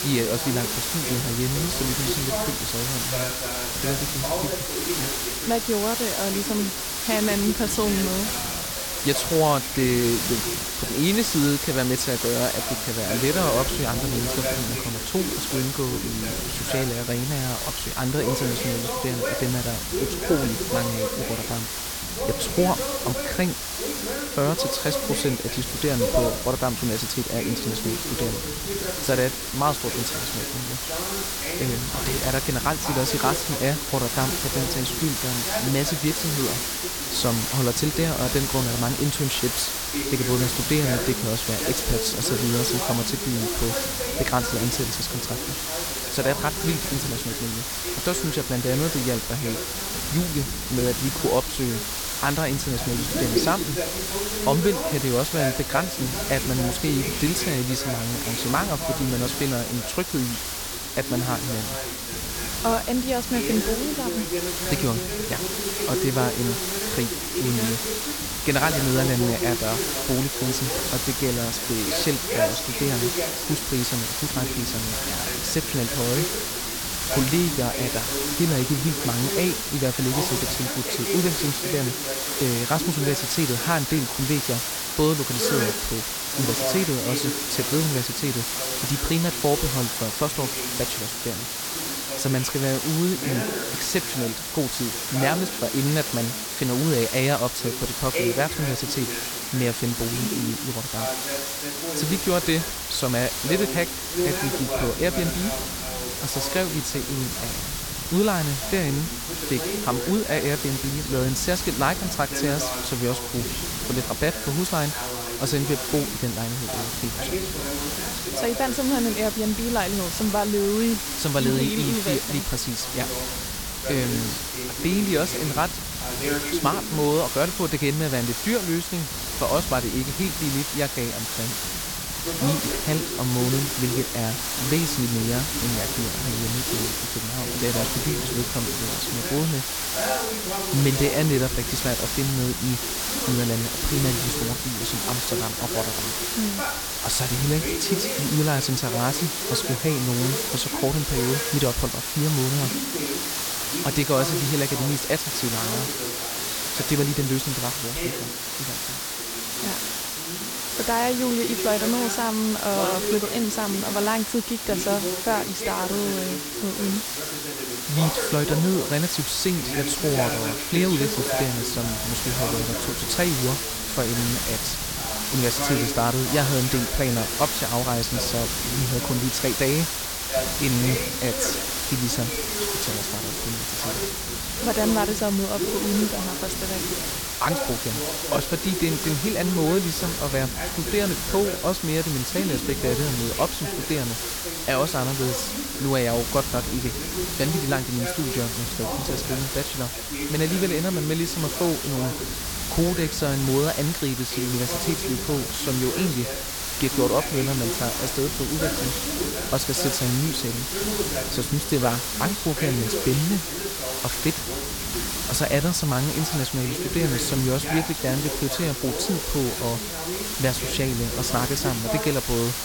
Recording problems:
voice in the background; loud; throughout; 7 dB below the speech
hiss; loud; throughout; 1 dB below the speech
low rumble; faint; until 1:21, from 1:42 to 2:28 and from 2:49 on; 20 dB below the speech

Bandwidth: 17.5 kHz